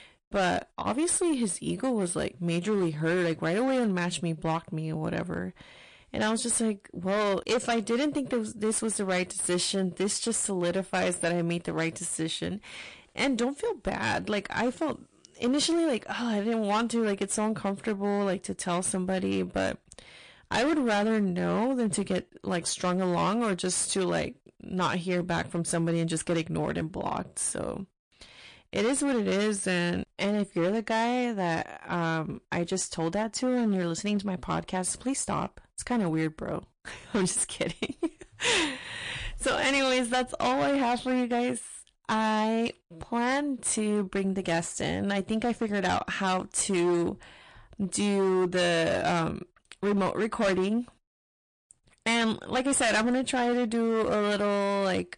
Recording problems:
distortion; heavy; 12% of the sound clipped
garbled, watery; slightly; nothing above 9 kHz

